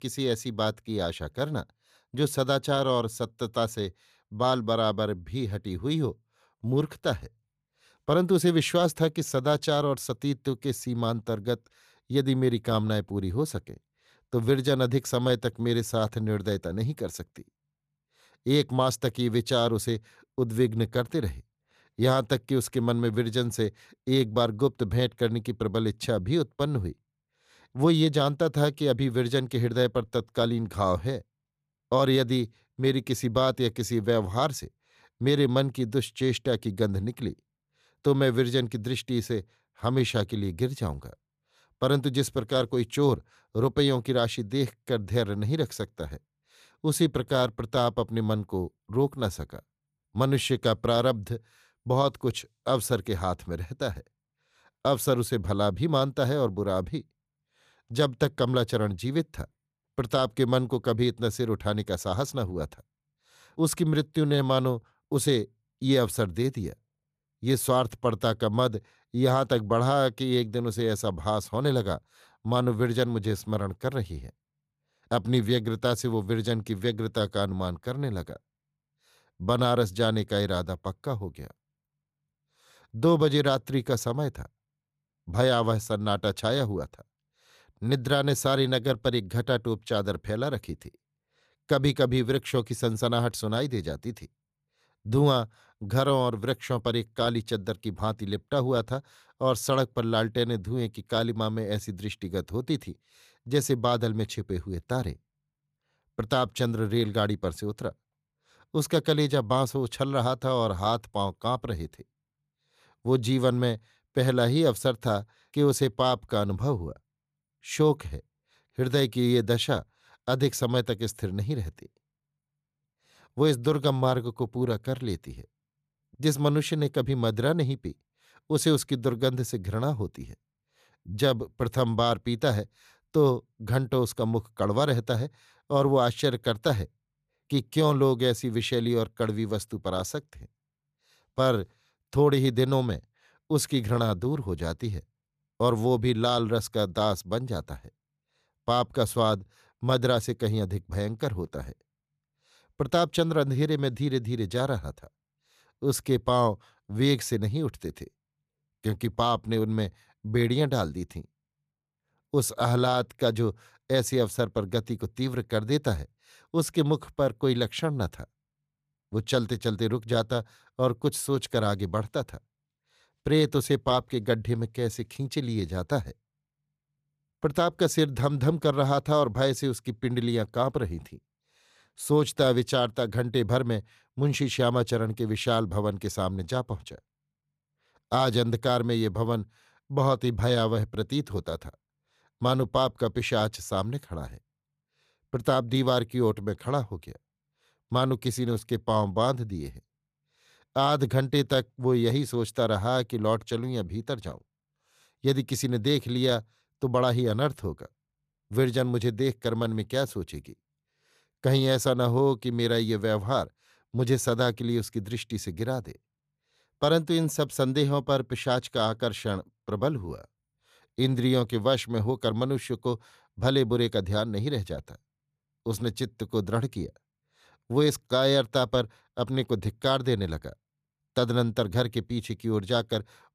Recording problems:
none

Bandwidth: 14.5 kHz